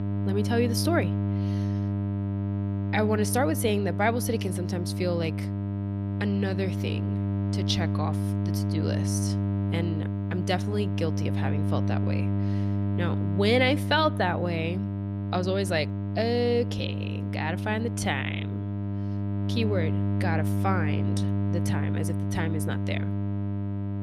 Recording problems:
electrical hum; loud; throughout; 50 Hz, 8 dB below the speech

